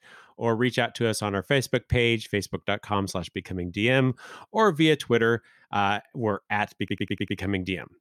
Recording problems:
audio stuttering; at 7 s

